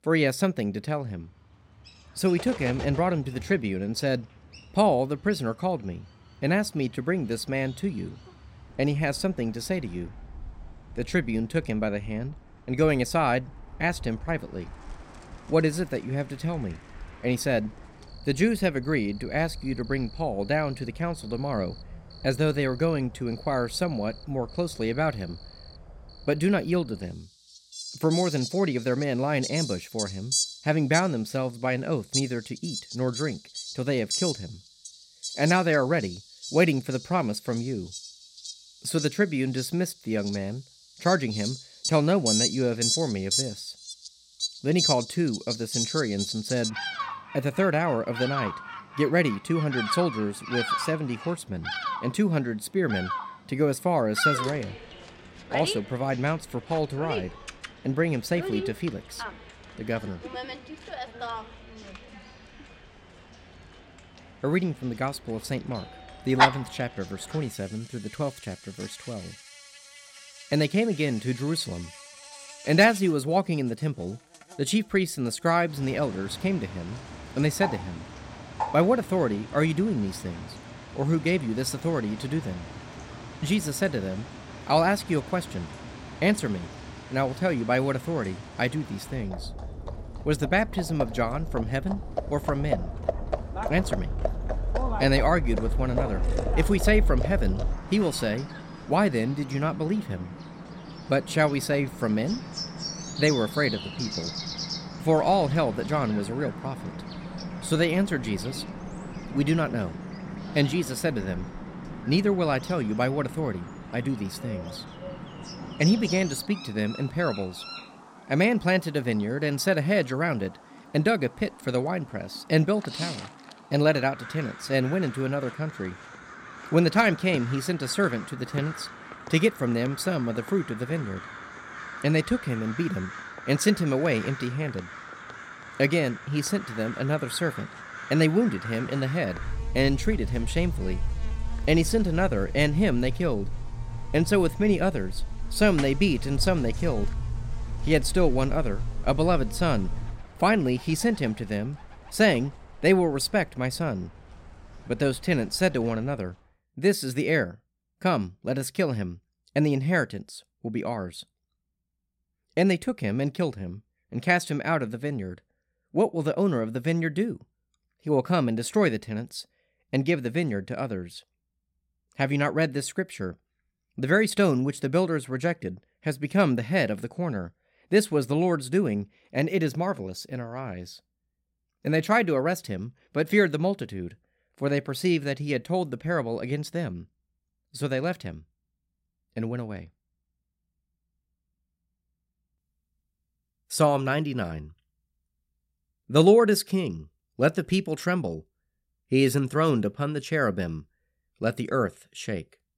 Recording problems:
animal sounds; loud; until 2:36; 8 dB below the speech

